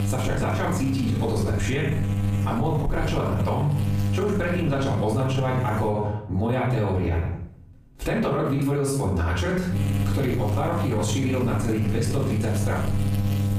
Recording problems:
off-mic speech; far
room echo; noticeable; dies away in 0.5 s
squashed, flat; somewhat
electrical hum; loud; until 6 s and from 10 s on; 50 Hz, 9 dB below the speech

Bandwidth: 15 kHz